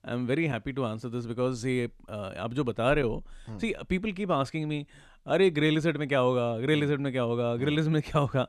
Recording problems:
none

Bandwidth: 13.5 kHz